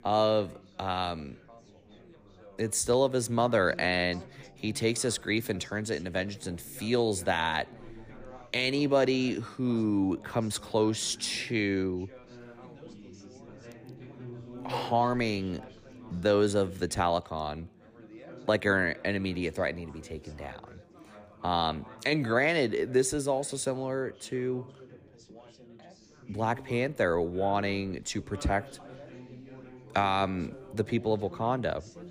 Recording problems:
background chatter; faint; throughout; 4 voices, 20 dB below the speech

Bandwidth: 15 kHz